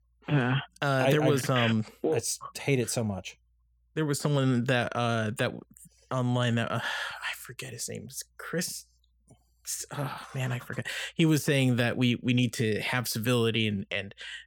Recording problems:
none

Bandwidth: 18 kHz